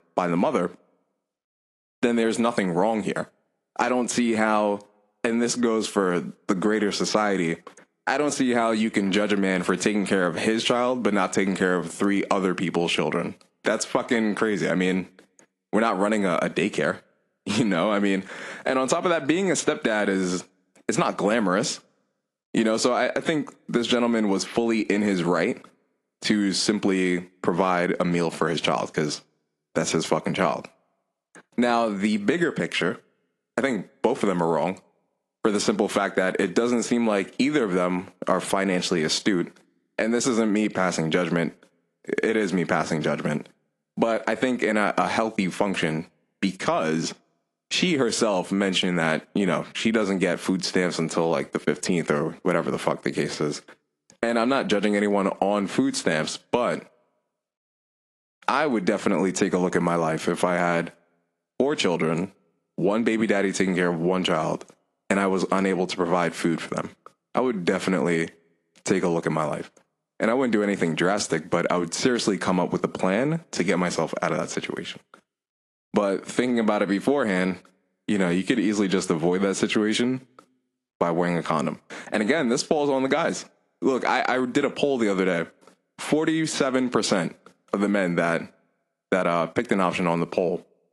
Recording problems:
garbled, watery; slightly
squashed, flat; somewhat

